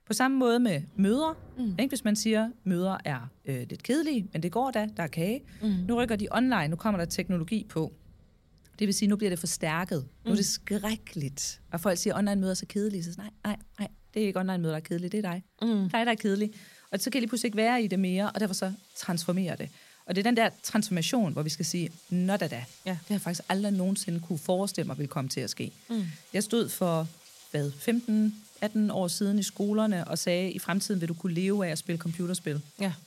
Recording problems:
rain or running water; faint; throughout; 25 dB below the speech

